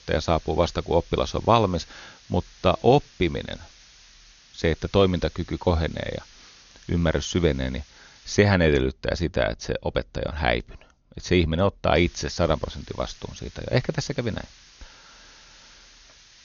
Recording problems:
high frequencies cut off; noticeable; nothing above 6.5 kHz
hiss; faint; until 8.5 s and from 12 s on; 25 dB below the speech

